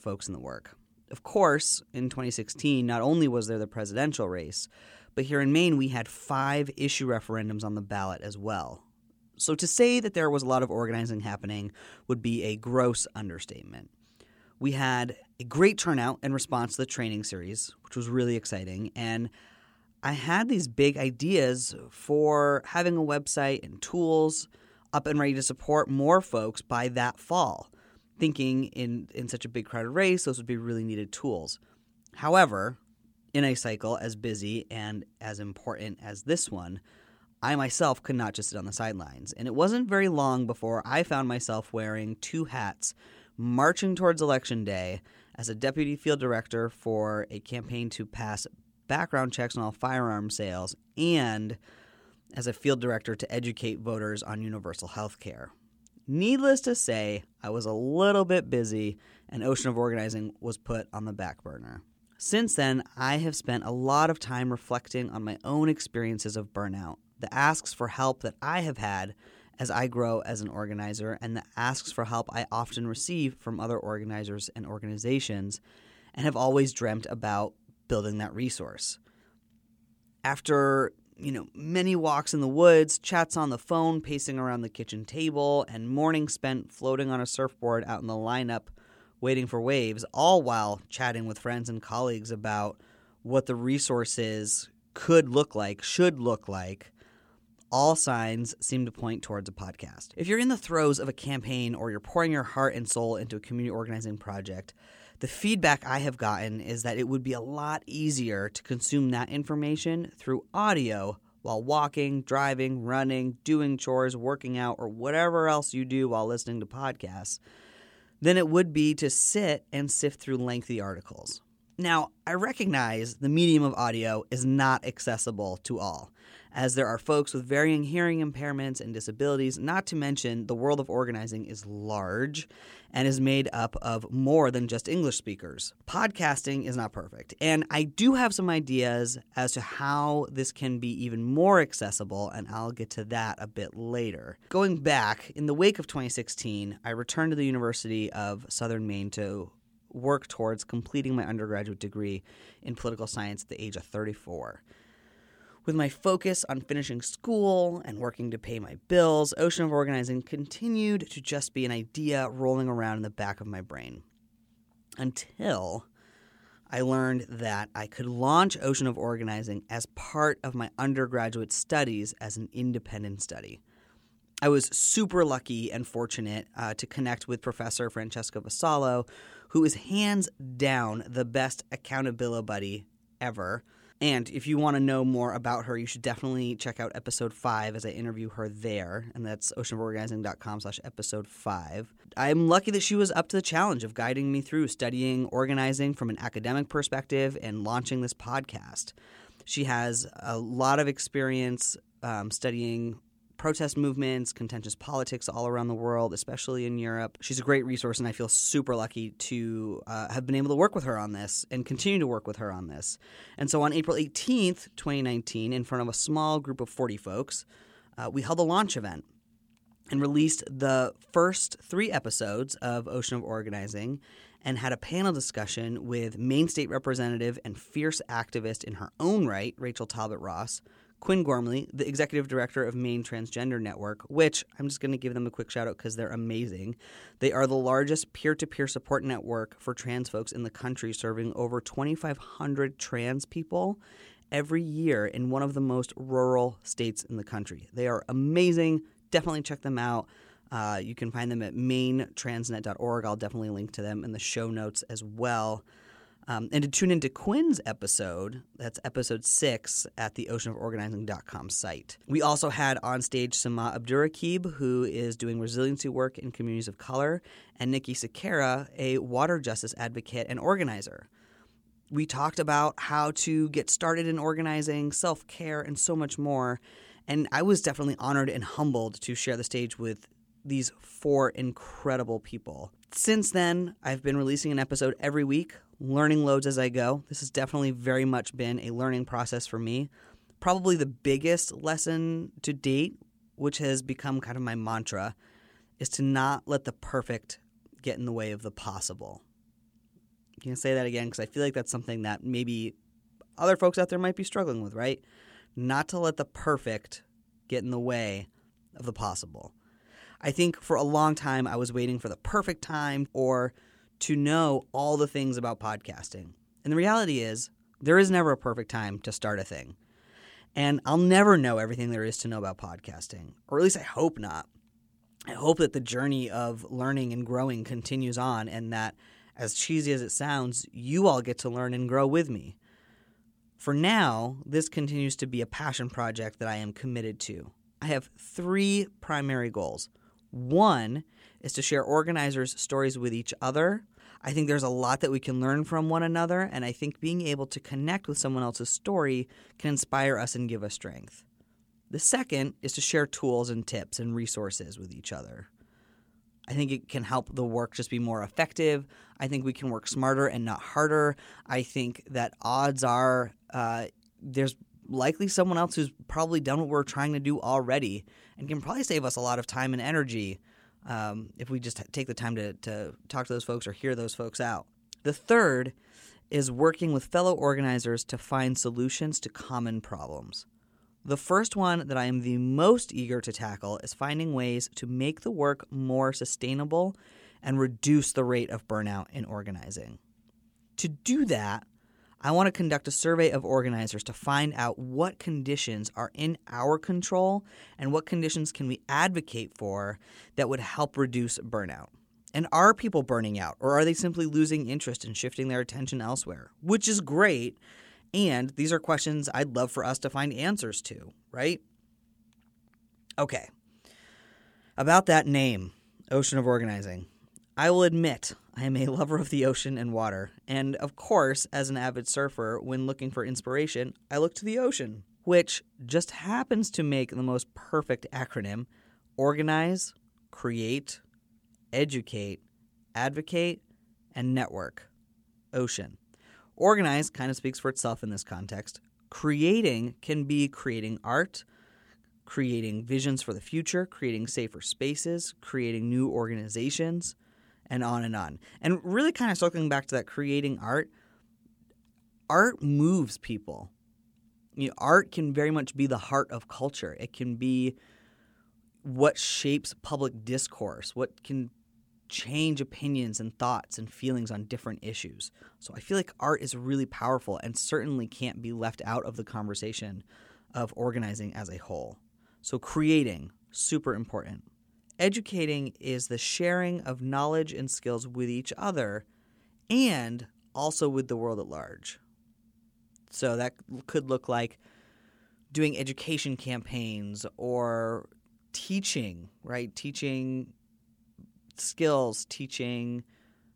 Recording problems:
none

